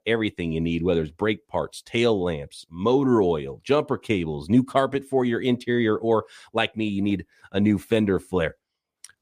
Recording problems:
none

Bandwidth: 15 kHz